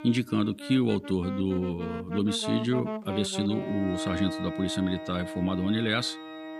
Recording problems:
background music; loud; throughout; 8 dB below the speech

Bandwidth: 15 kHz